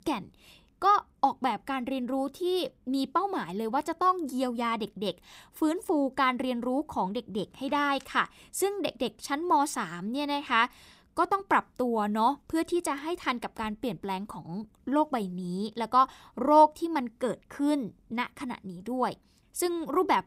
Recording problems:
none

